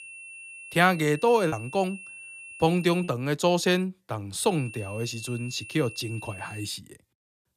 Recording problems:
high-pitched whine; noticeable; until 3 s and from 4.5 to 6.5 s; 2.5 kHz, 15 dB below the speech
choppy; occasionally; from 1.5 to 3 s; 1% of the speech affected

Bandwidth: 14.5 kHz